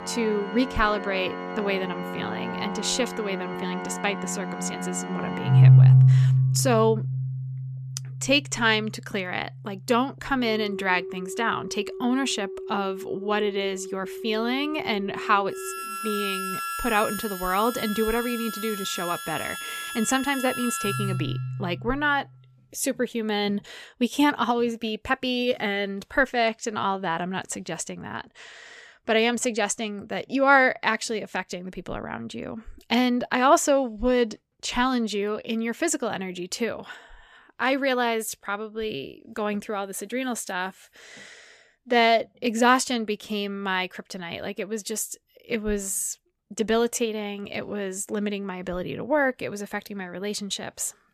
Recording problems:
background music; loud; until 22 s; as loud as the speech

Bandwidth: 14.5 kHz